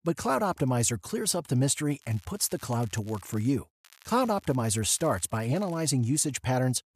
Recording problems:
crackling; faint; from 2 to 3.5 s and from 4 to 6 s; 25 dB below the speech

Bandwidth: 14.5 kHz